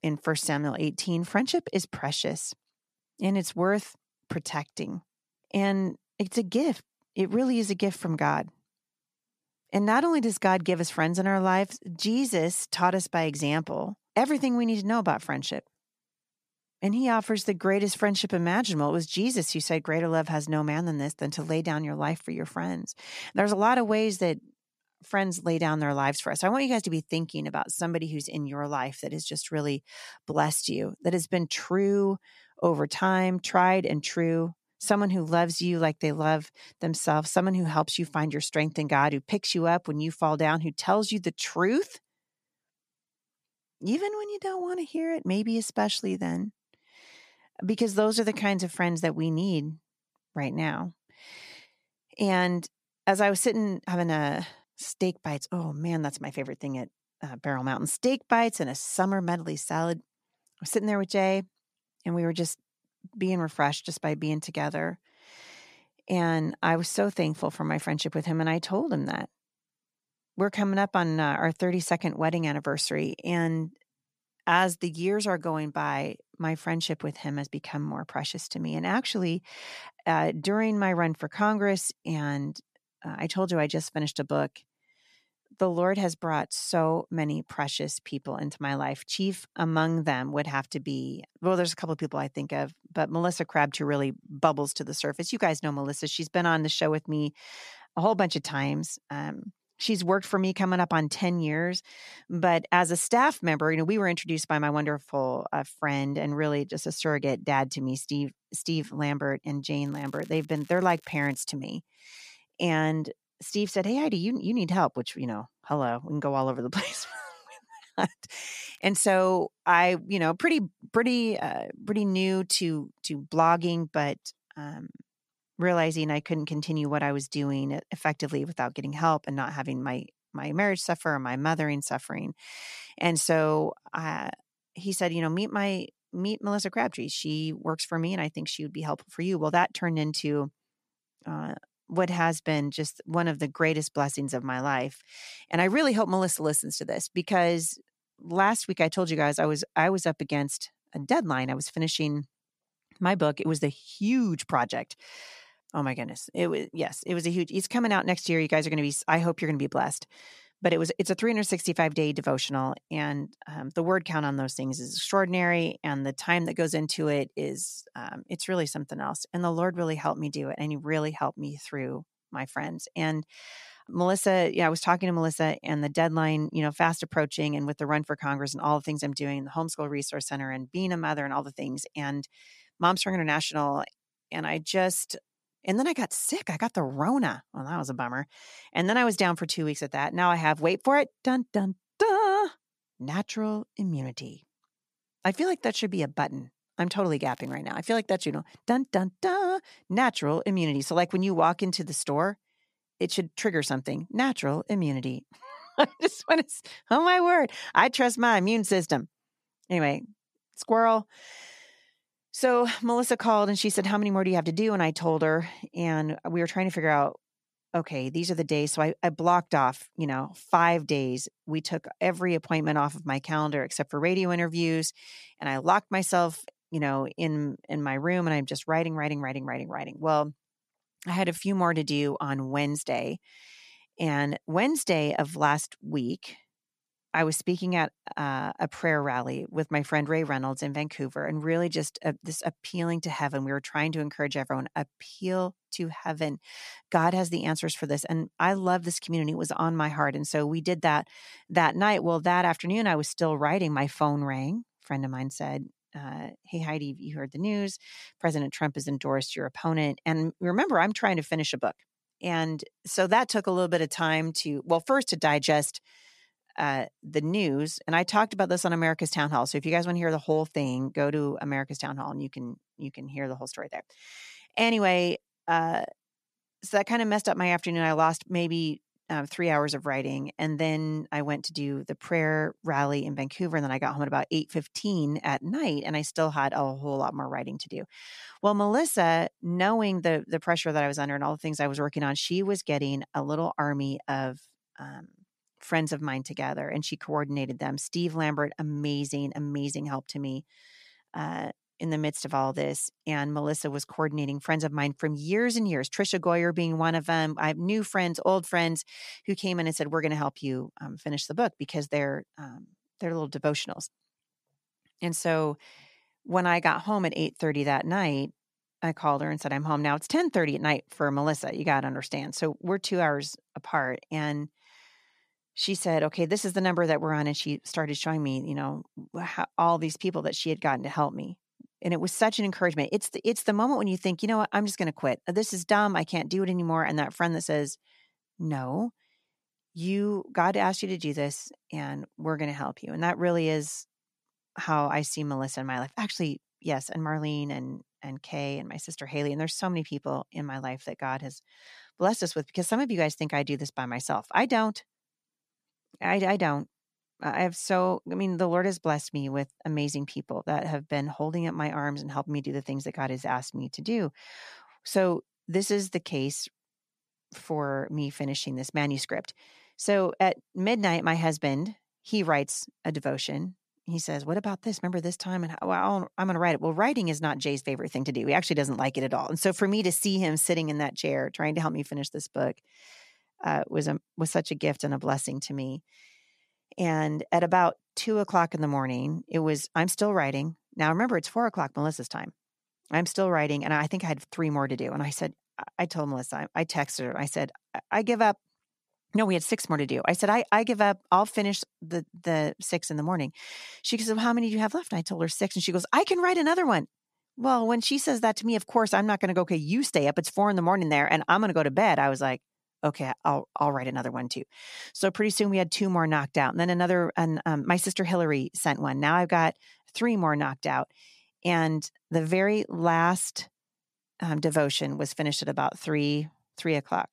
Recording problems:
crackling; faint; 4 times, first at 1:50; 30 dB below the speech

